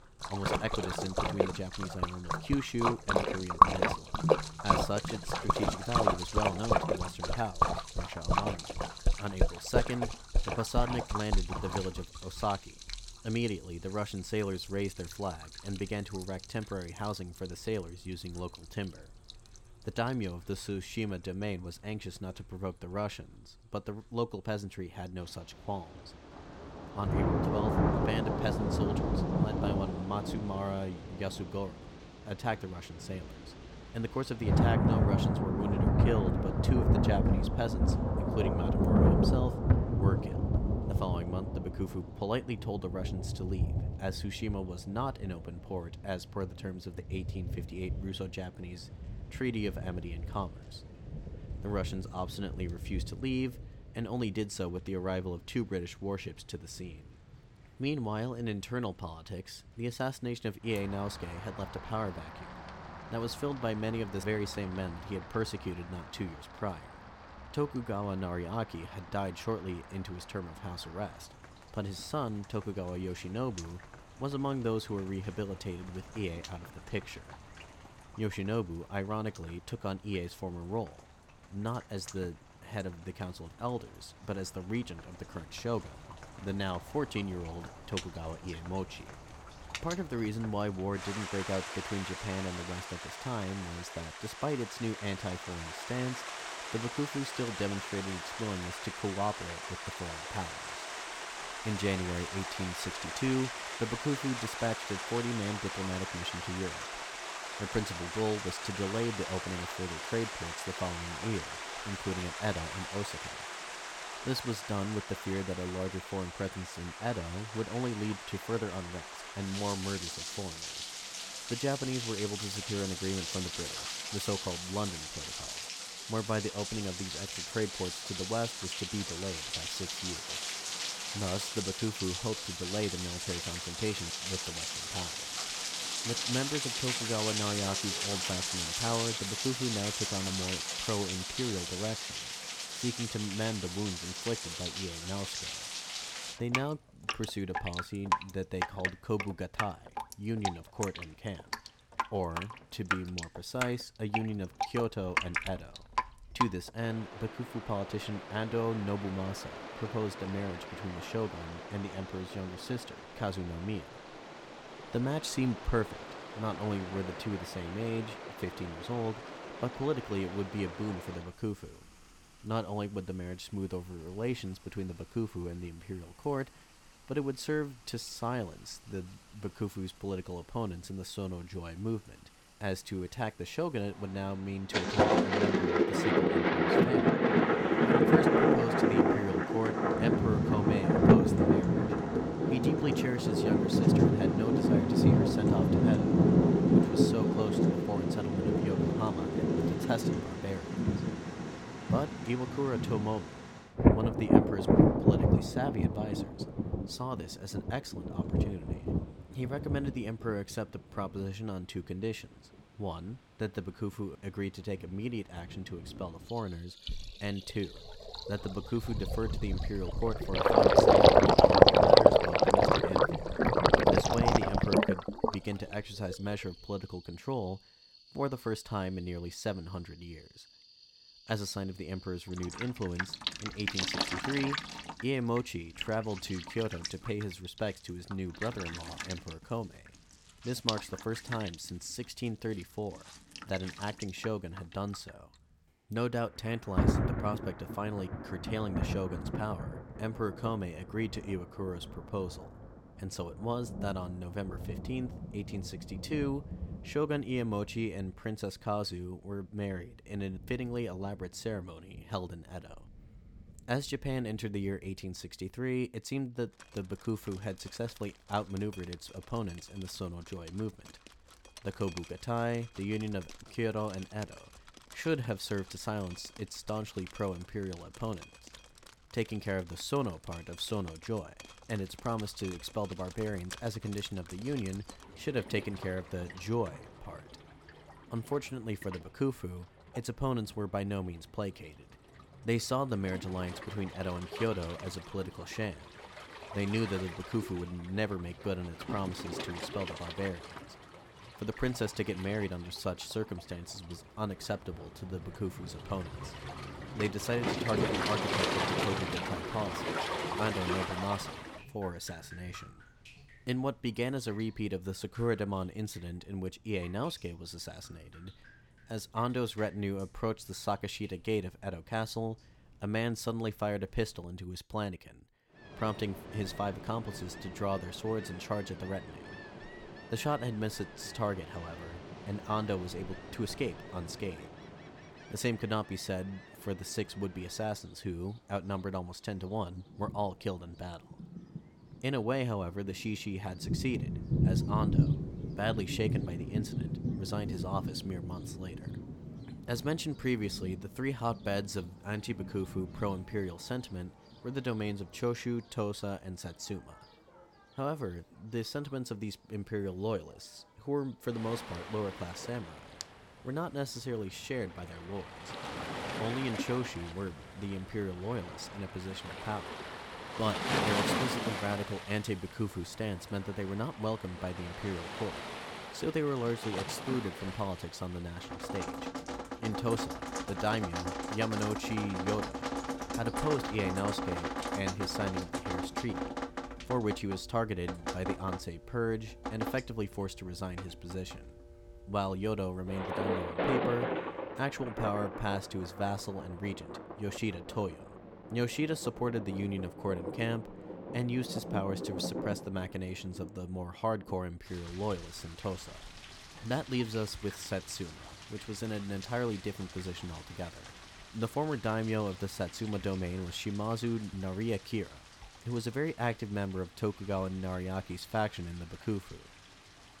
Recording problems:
rain or running water; very loud; throughout; 4 dB above the speech

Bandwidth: 17.5 kHz